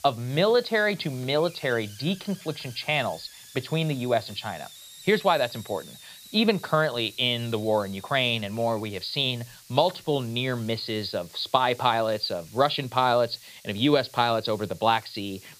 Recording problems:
high frequencies cut off; severe; nothing above 5 kHz
hiss; noticeable; throughout; 20 dB below the speech

